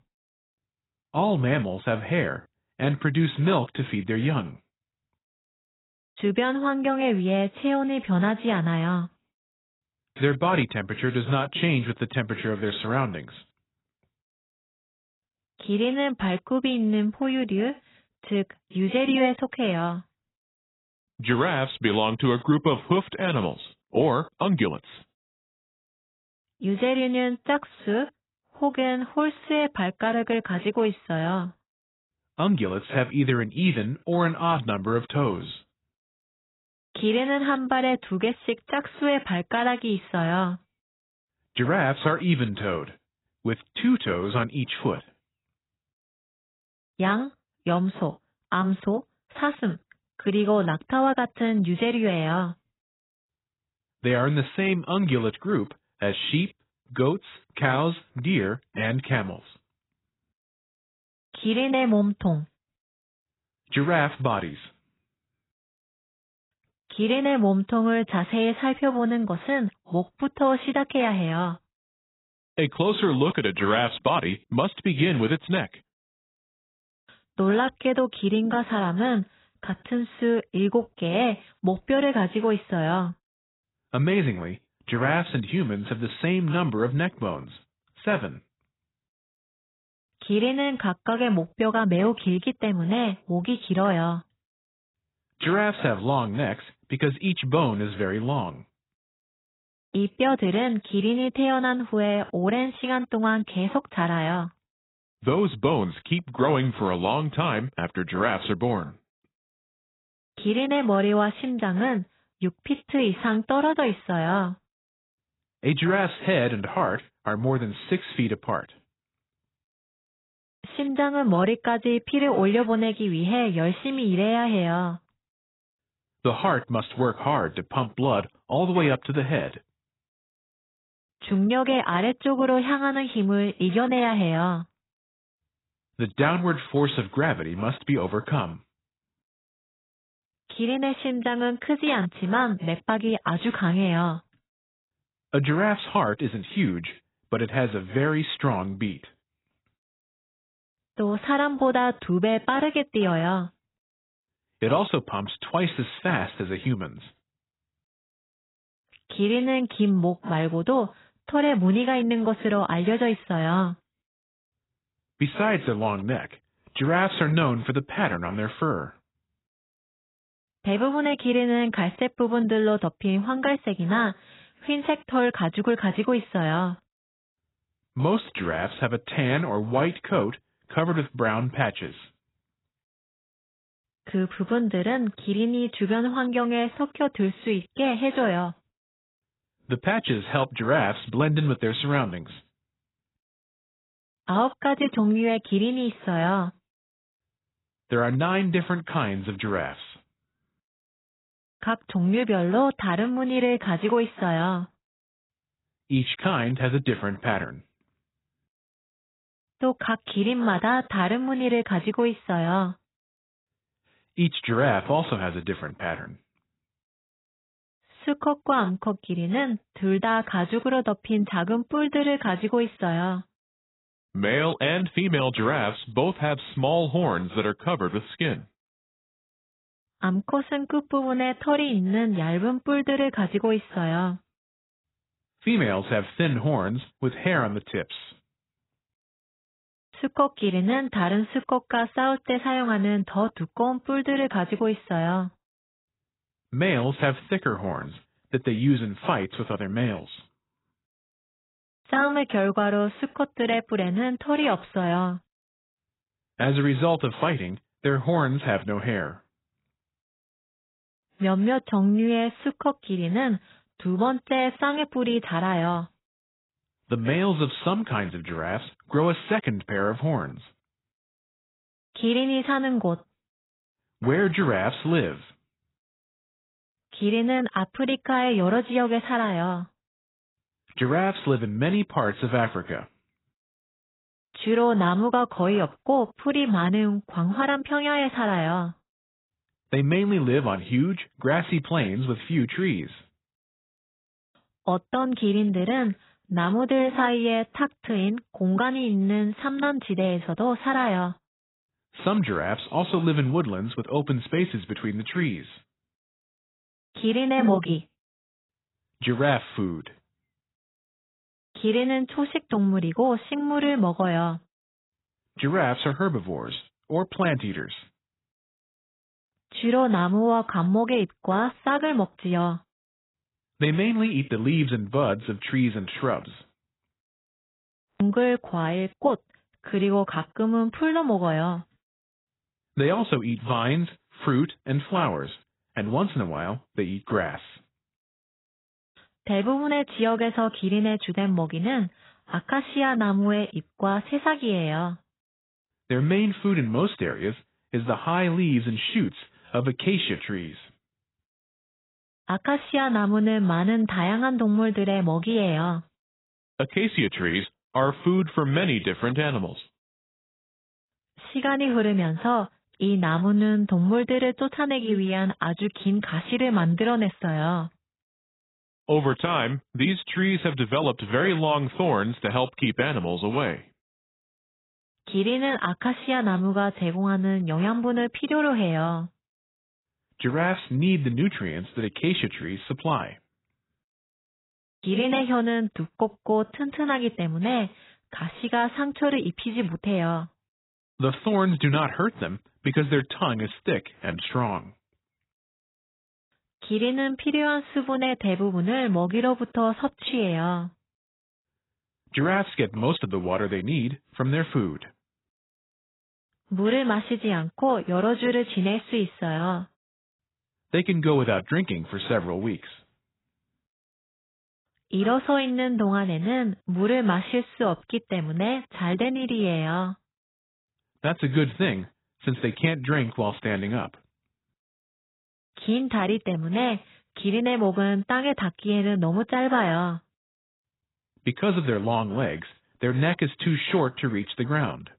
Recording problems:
garbled, watery; badly; nothing above 4 kHz

